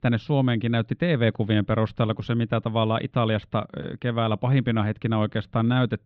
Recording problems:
muffled; very; fading above 3.5 kHz

